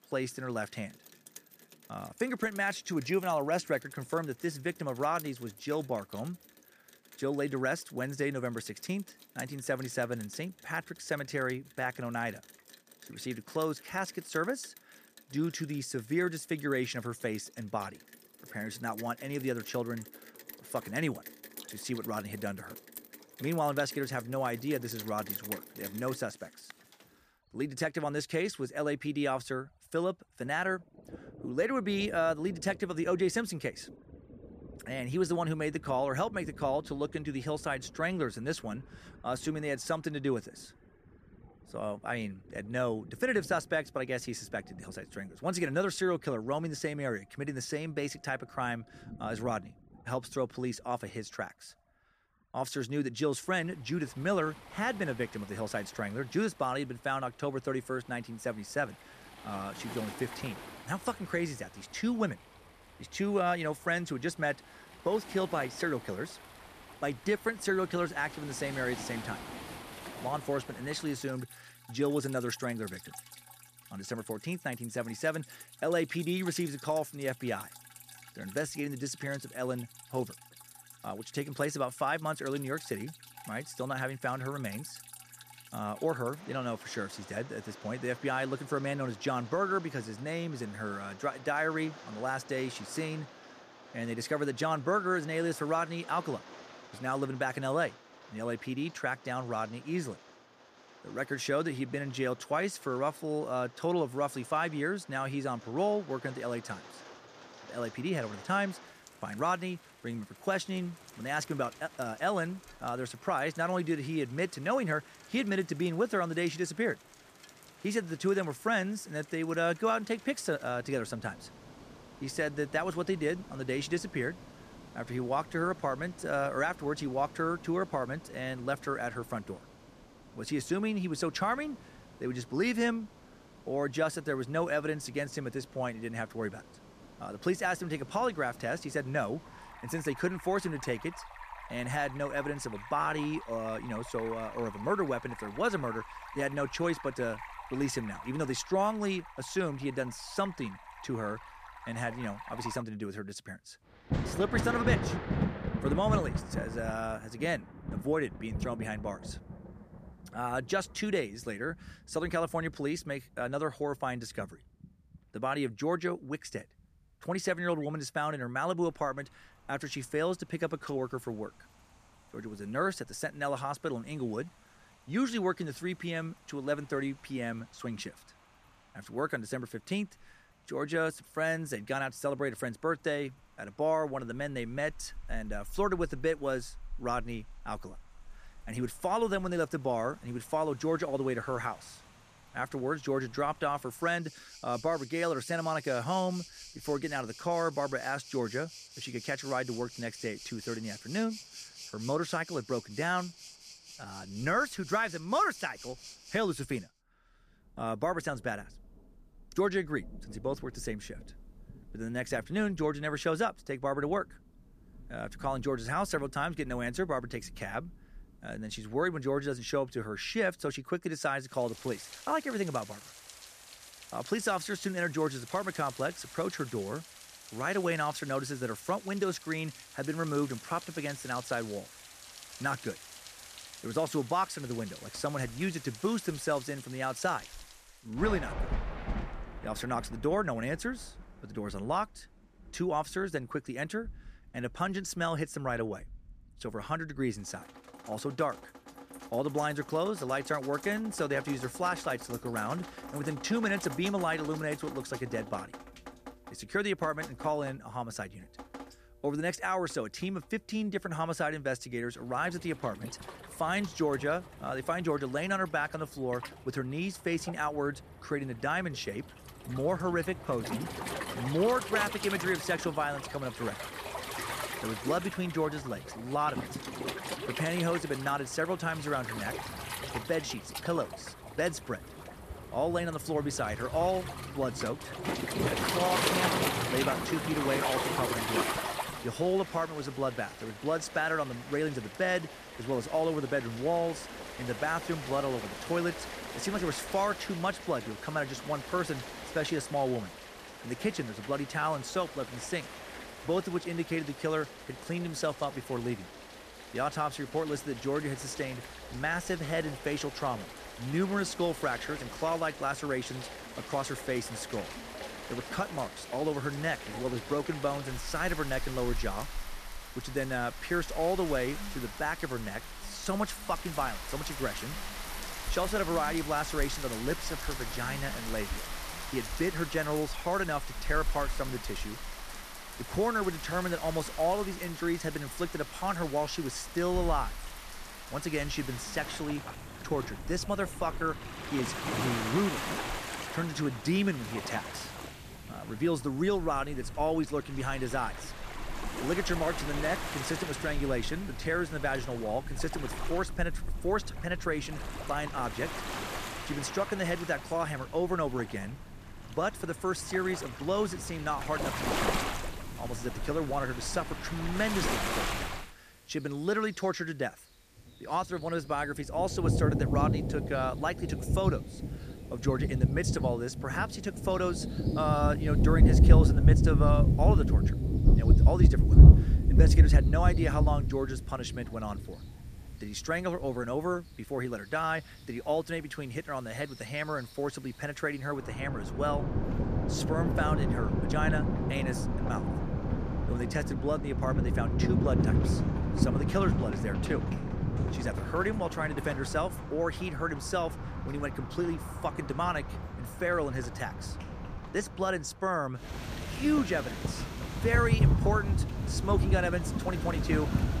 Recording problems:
rain or running water; loud; throughout; 1 dB below the speech

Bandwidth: 14.5 kHz